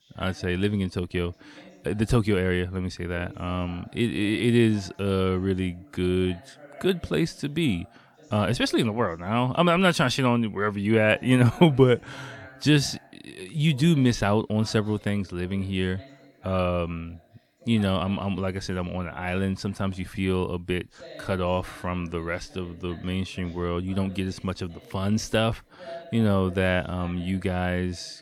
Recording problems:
voice in the background; faint; throughout; 25 dB below the speech

